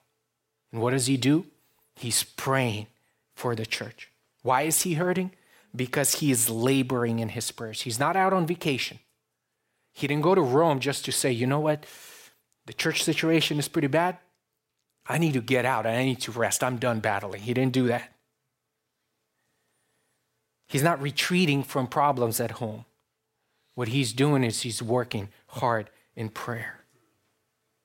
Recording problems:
none

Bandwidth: 16 kHz